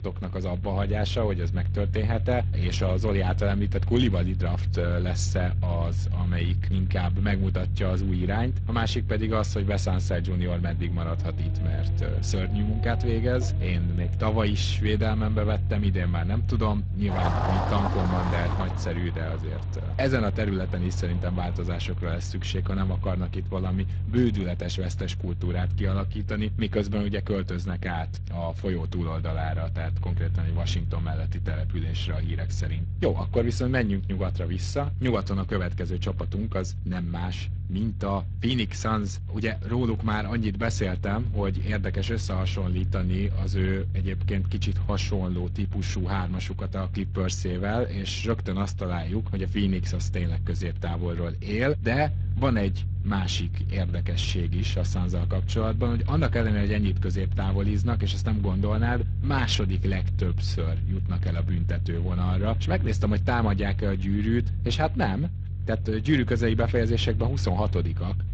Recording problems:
garbled, watery; slightly
traffic noise; loud; until 26 s; 9 dB below the speech
low rumble; noticeable; throughout; 15 dB below the speech

